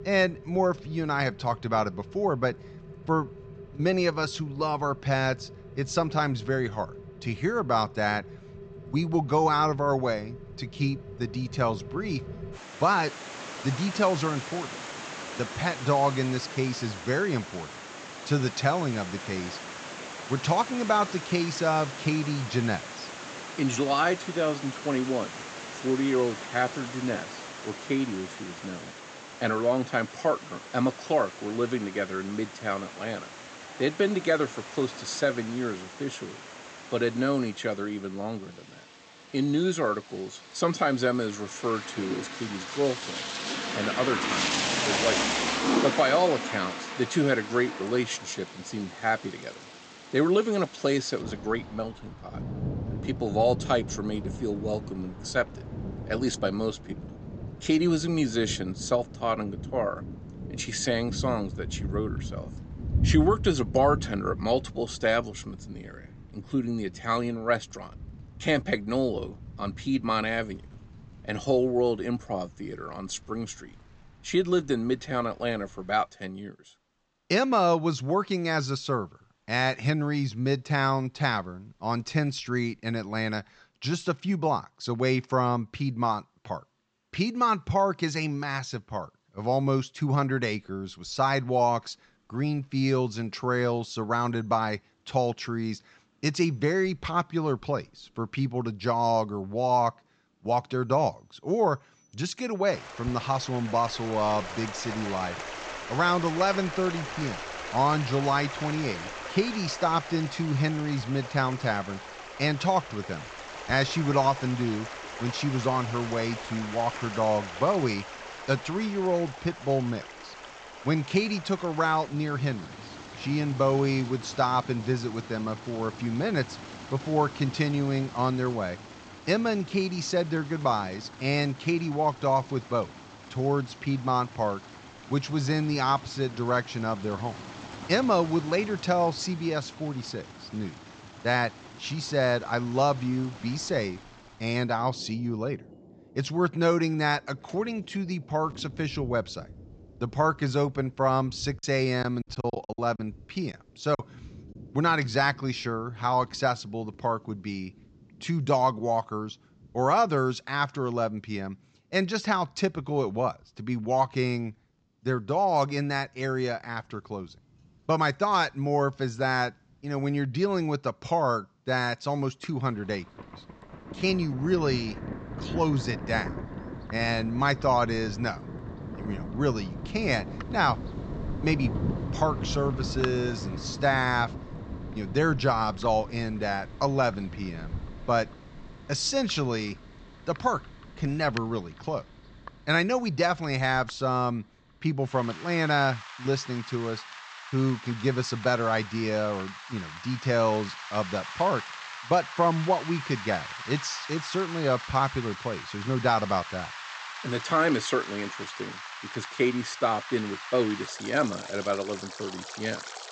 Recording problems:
high frequencies cut off; noticeable; nothing above 8 kHz
rain or running water; loud; throughout; 10 dB below the speech
choppy; very; from 2:32 to 2:34; 12% of the speech affected

